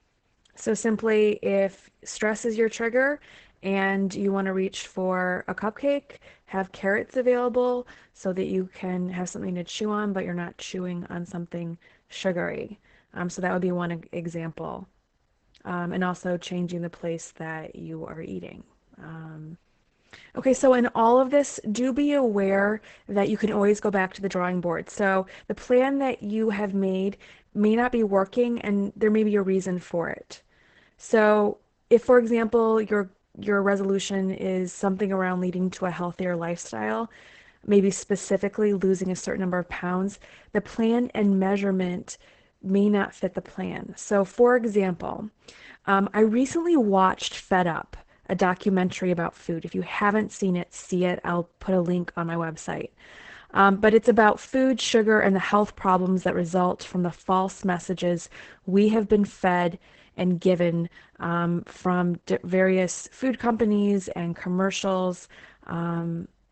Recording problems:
garbled, watery; badly; nothing above 8 kHz

